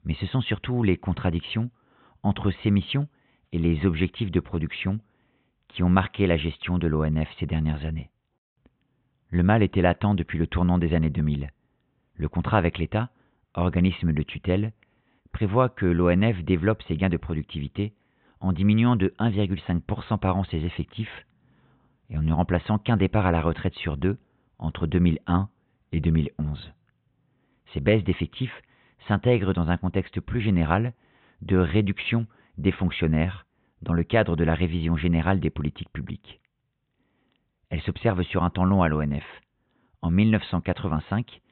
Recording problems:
high frequencies cut off; severe; nothing above 3.5 kHz

